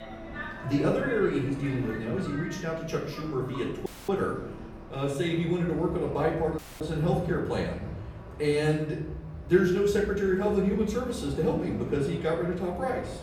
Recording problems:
off-mic speech; far
room echo; noticeable; dies away in 0.8 s
train or aircraft noise; noticeable; throughout; 15 dB below the speech
audio cutting out; at 4 s and at 6.5 s

